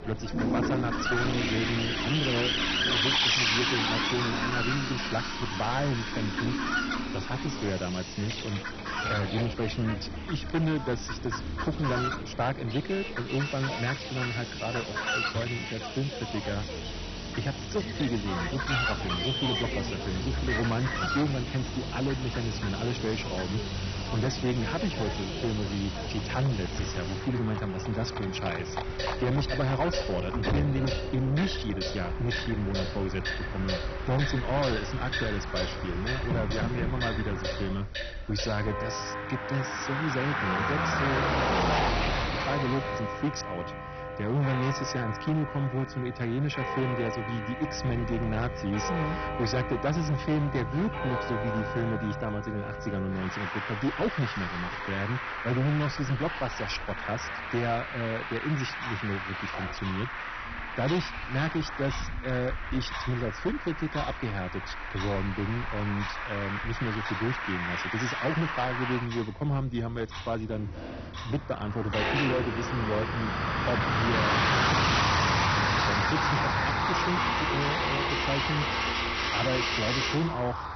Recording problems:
distortion; heavy; 10% of the sound clipped
garbled, watery; badly; nothing above 6 kHz
animal sounds; loud; throughout; 5 dB below the speech
household noises; loud; throughout; 4 dB below the speech
traffic noise; loud; throughout; as loud as the speech

